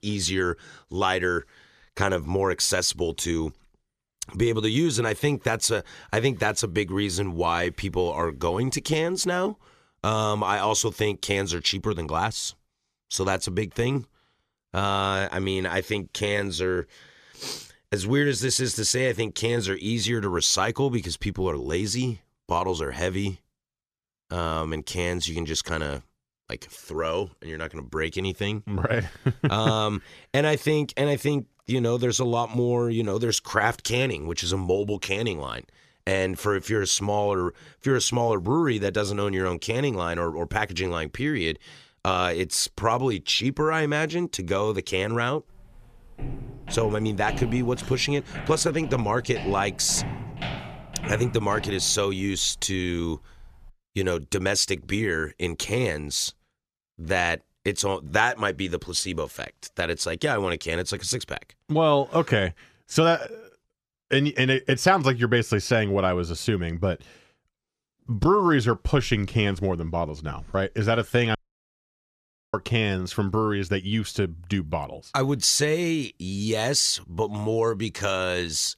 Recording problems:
footsteps; noticeable; from 46 to 54 s; peak 8 dB below the speech
audio cutting out; at 1:11 for 1 s

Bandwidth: 14.5 kHz